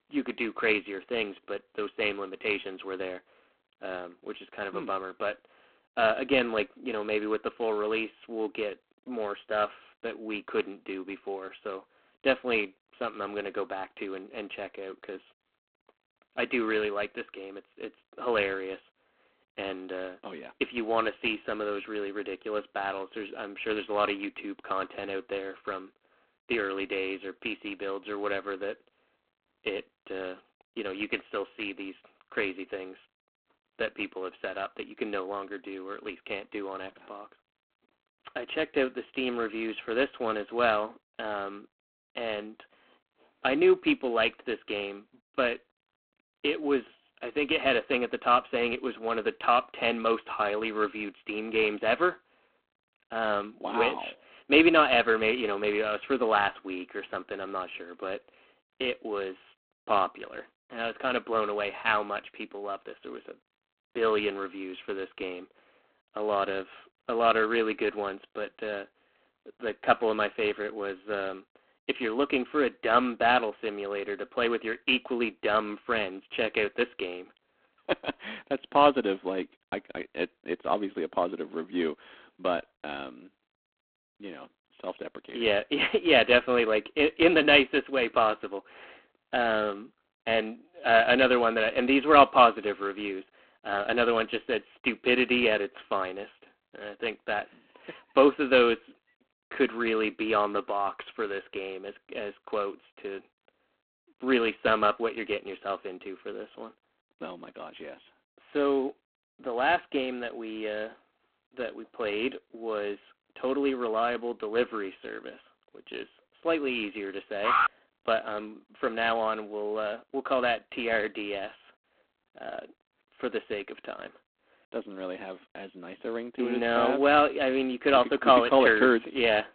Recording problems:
phone-call audio; poor line
alarm; loud; at 1:57; peak 4 dB above the speech

